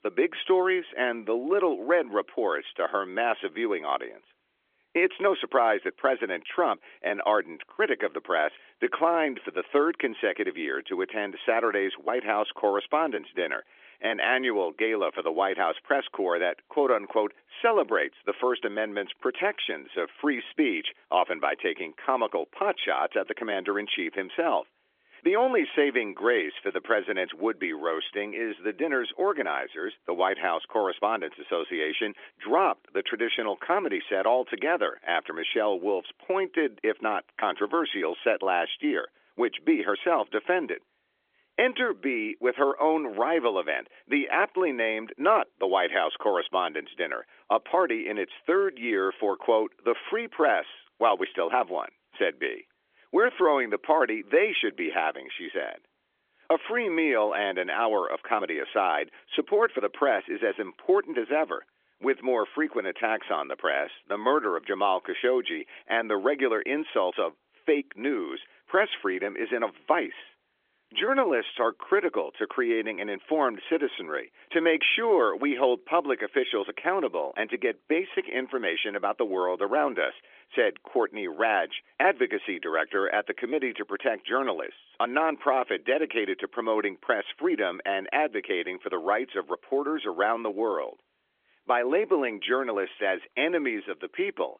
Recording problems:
phone-call audio; nothing above 3.5 kHz

